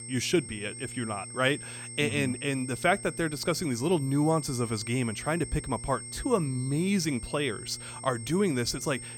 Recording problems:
high-pitched whine; noticeable; throughout; 8.5 kHz, 10 dB below the speech
electrical hum; faint; throughout; 60 Hz, 25 dB below the speech

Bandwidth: 17 kHz